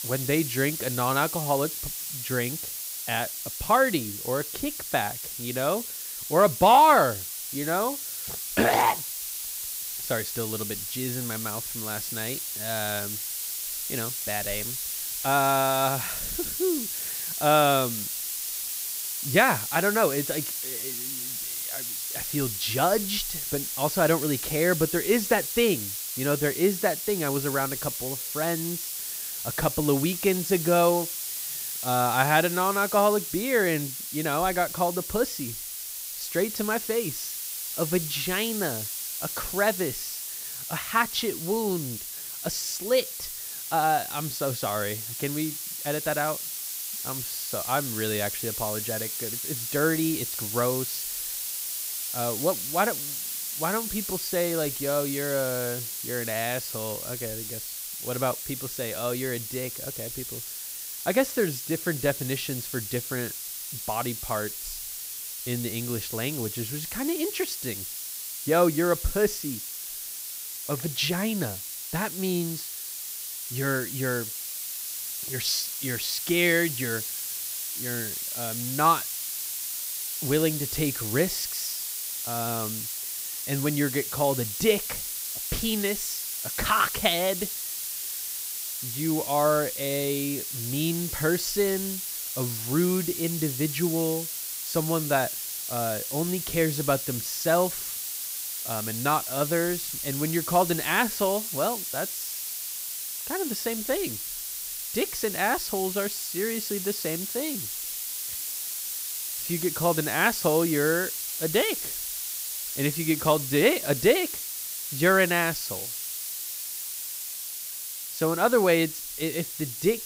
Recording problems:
hiss; loud; throughout; 4 dB below the speech

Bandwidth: 15.5 kHz